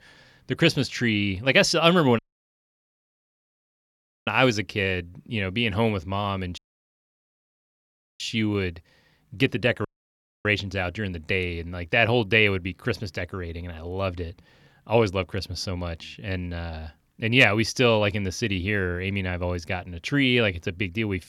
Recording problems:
audio cutting out; at 2 s for 2 s, at 6.5 s for 1.5 s and at 10 s for 0.5 s

